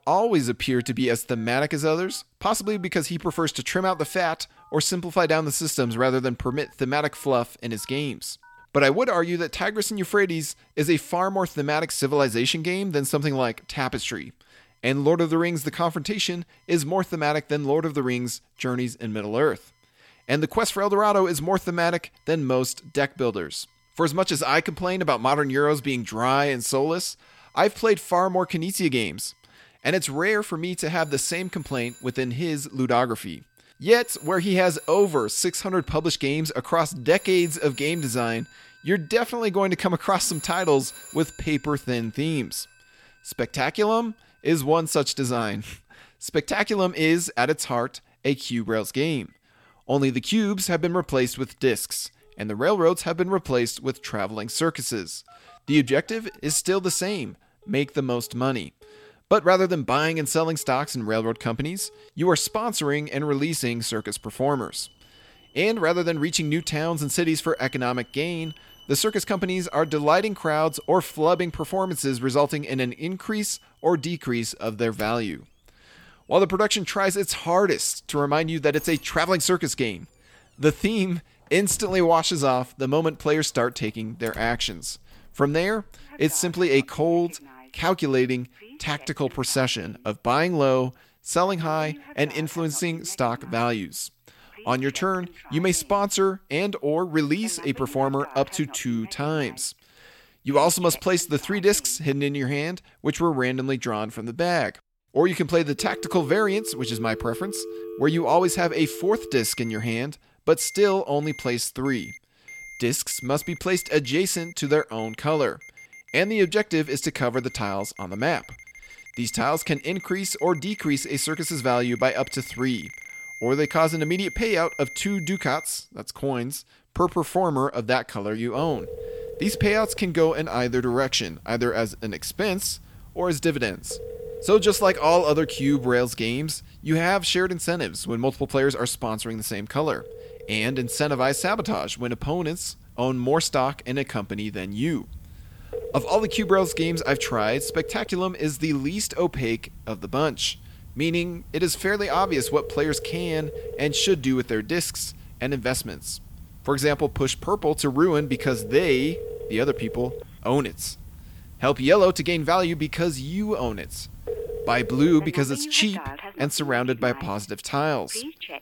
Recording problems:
alarms or sirens; noticeable; throughout; 15 dB below the speech

